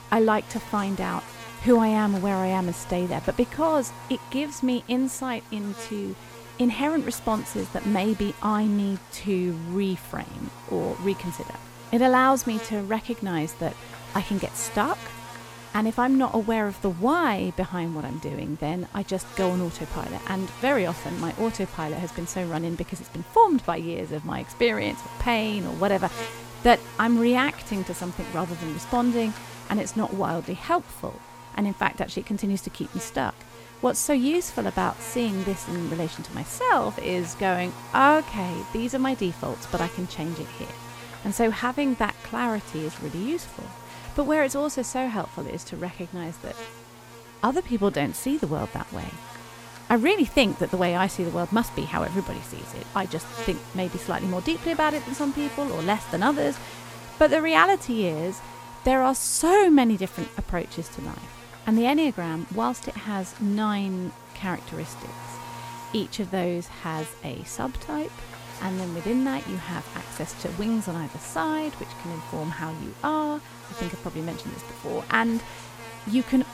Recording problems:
electrical hum; noticeable; throughout; 60 Hz, 15 dB below the speech

